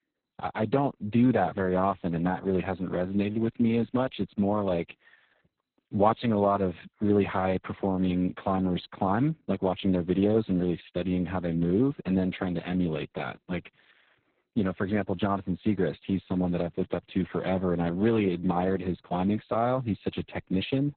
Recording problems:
garbled, watery; badly; nothing above 4 kHz

